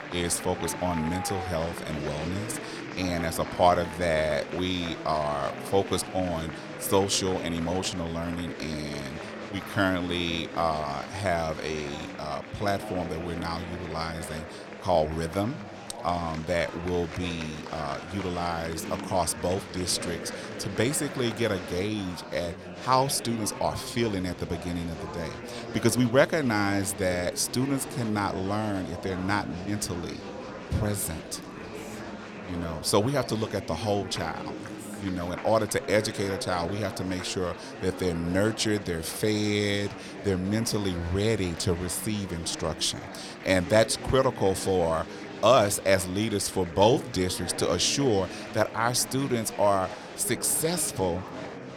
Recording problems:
murmuring crowd; noticeable; throughout; 10 dB below the speech

